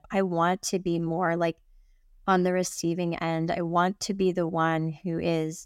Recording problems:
none

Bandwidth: 16 kHz